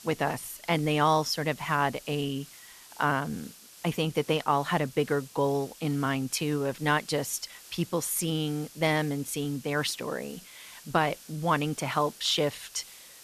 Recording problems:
hiss; noticeable; throughout; 20 dB below the speech

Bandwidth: 14 kHz